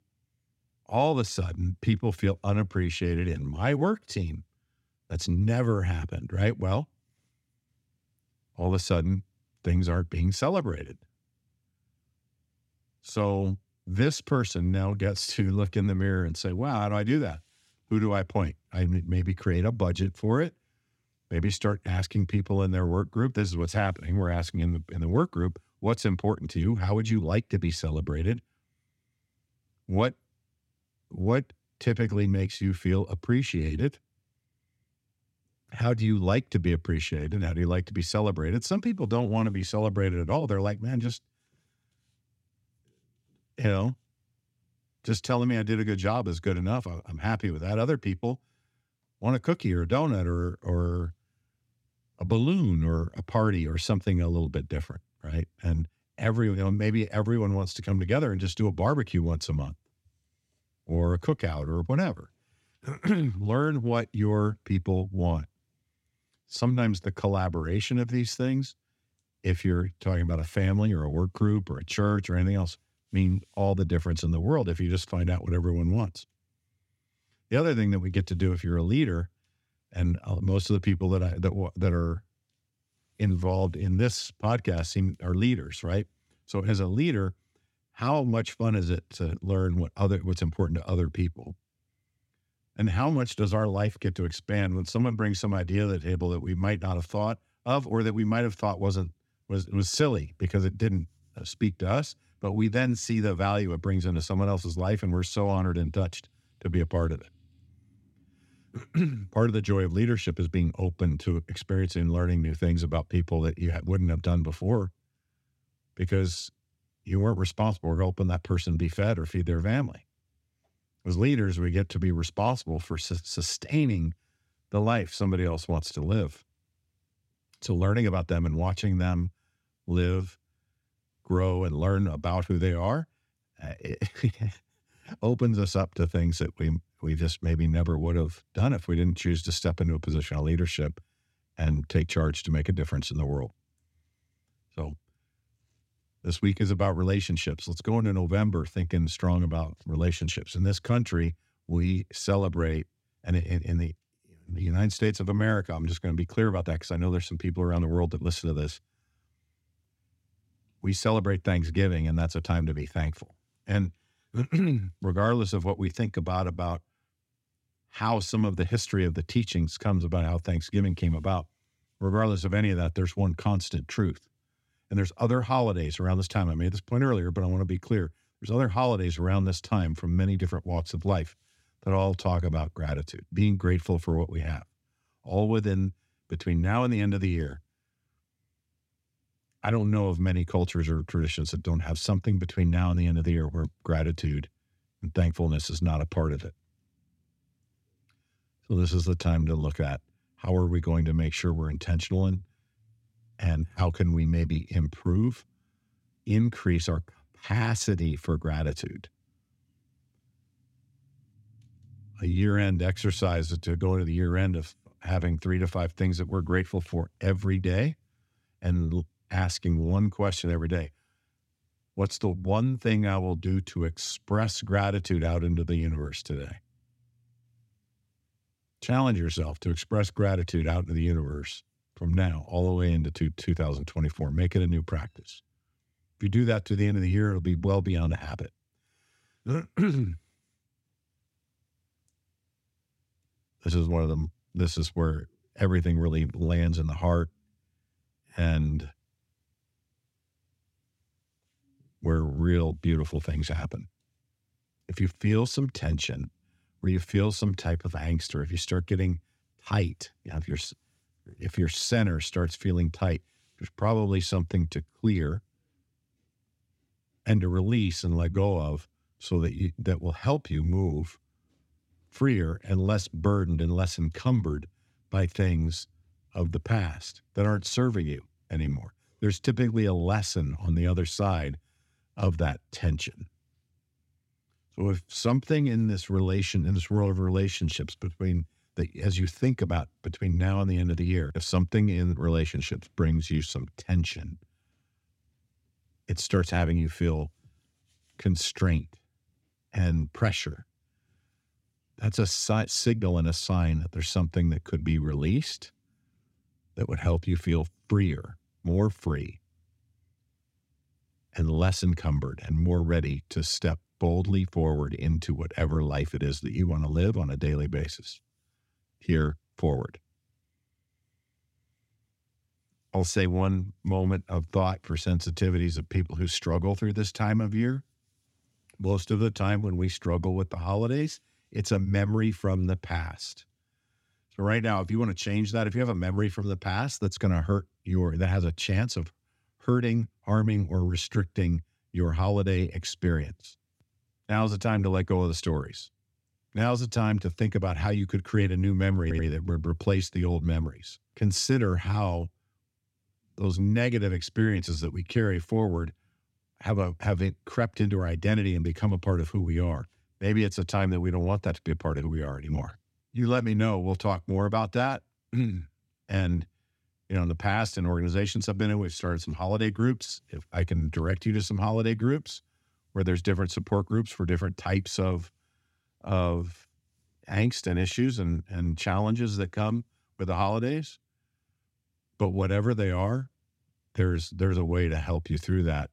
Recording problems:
audio stuttering; at 5:49

